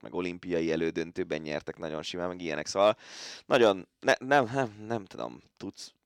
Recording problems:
none

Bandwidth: 18 kHz